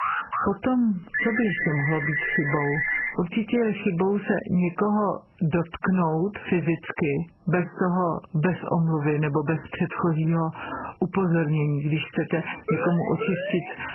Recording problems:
garbled, watery; badly; nothing above 3 kHz
squashed, flat; heavily
alarm; noticeable; at the start; peak 1 dB below the speech
phone ringing; loud; from 1 to 3 s; peak 1 dB above the speech
siren; noticeable; from 13 s on; peak 5 dB below the speech

